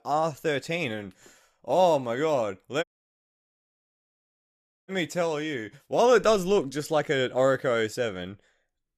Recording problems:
audio cutting out; at 3 s for 2 s

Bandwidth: 14 kHz